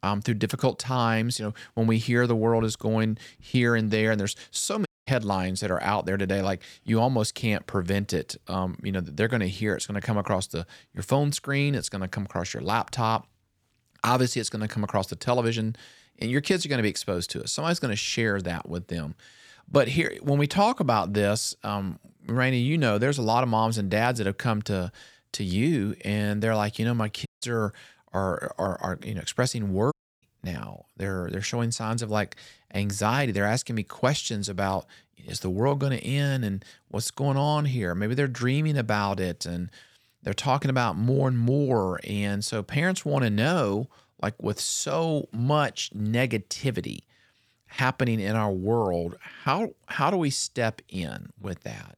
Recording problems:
audio cutting out; at 5 s, at 27 s and at 30 s

